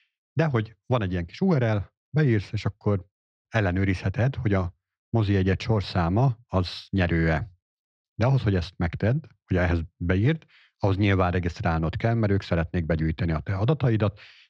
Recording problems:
muffled; slightly; fading above 3.5 kHz

